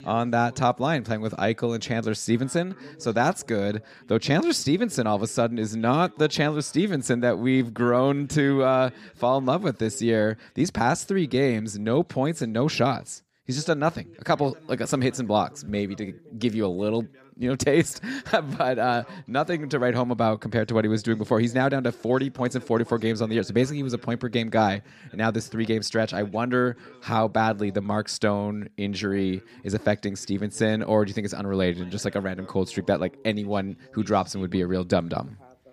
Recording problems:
background chatter; faint; throughout; 2 voices, 25 dB below the speech

